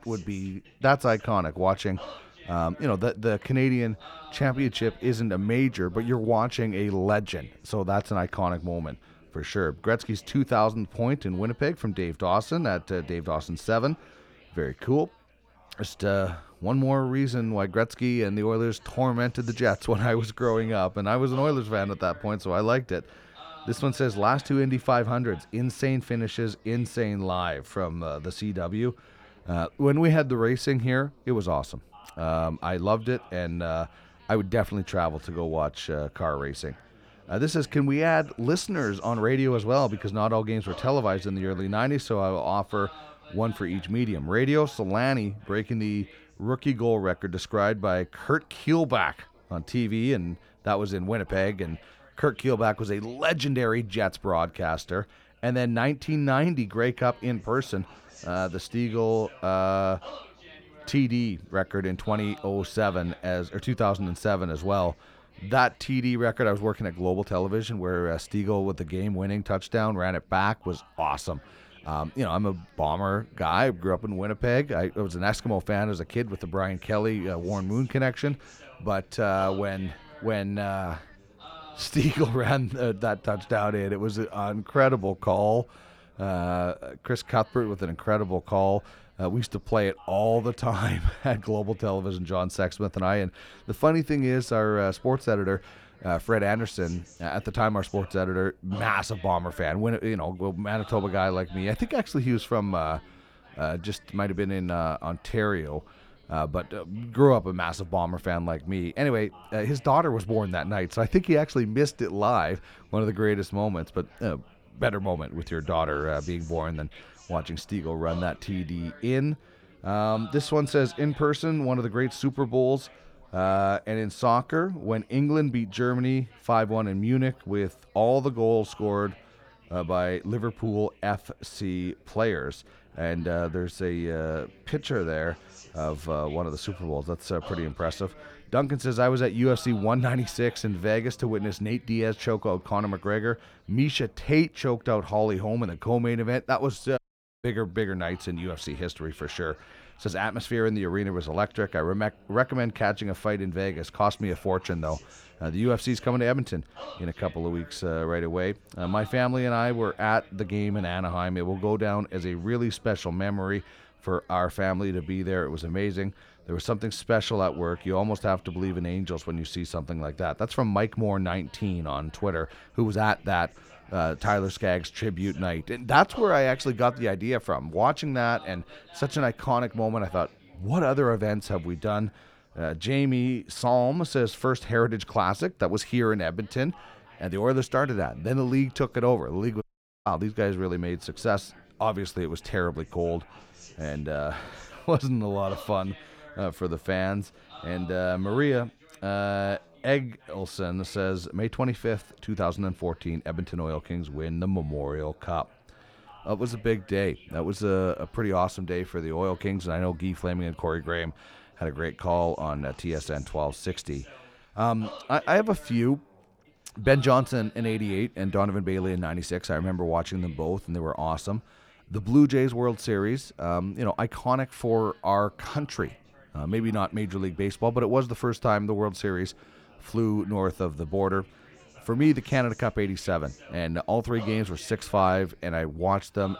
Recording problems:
background chatter; faint; throughout; 3 voices, 25 dB below the speech
audio cutting out; at 2:27 and at 3:10

